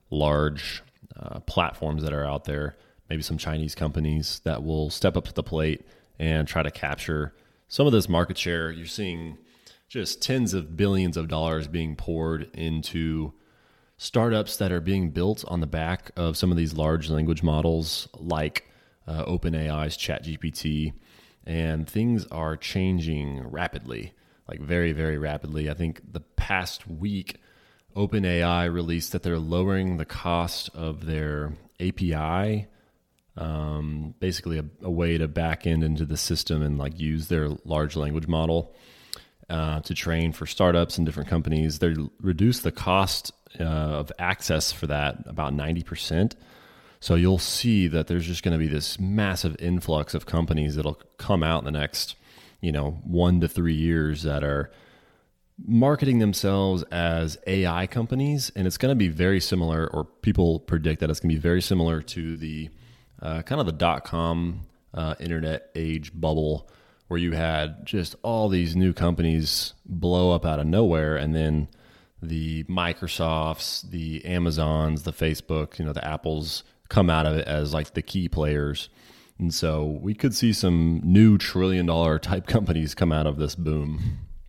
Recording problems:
choppy; occasionally; at 1:02; 1% of the speech affected

